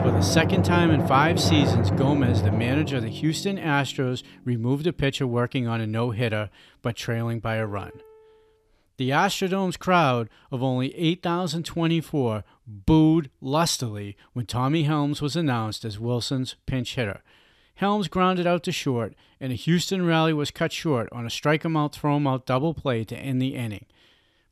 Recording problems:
background music; loud; until 8 s; as loud as the speech

